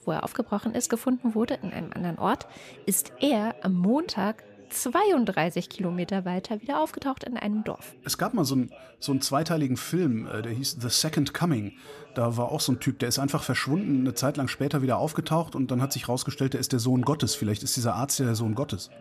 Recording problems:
background chatter; faint; throughout; 3 voices, 25 dB below the speech

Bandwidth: 14.5 kHz